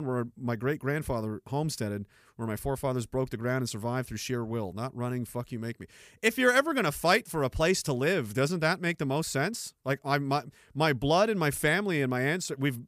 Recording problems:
abrupt cut into speech; at the start

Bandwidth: 15 kHz